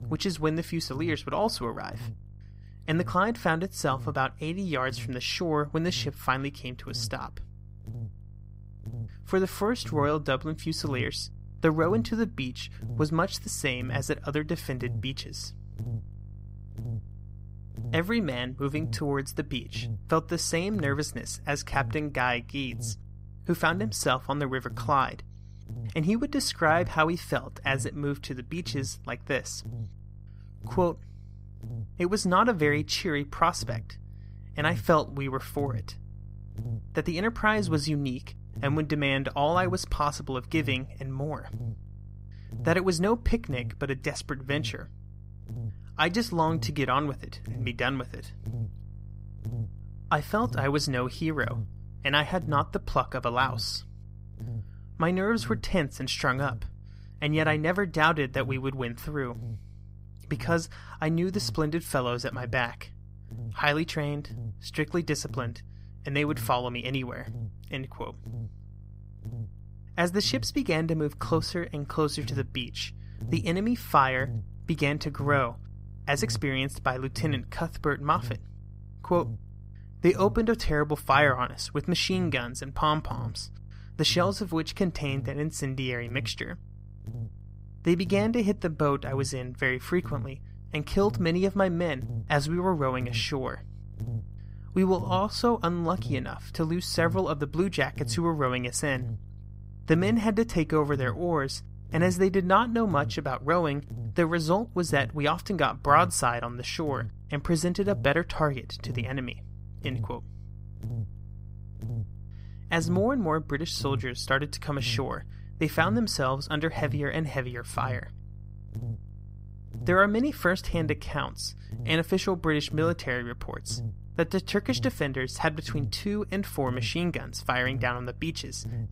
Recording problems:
electrical hum; faint; throughout; 50 Hz, 25 dB below the speech

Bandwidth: 15.5 kHz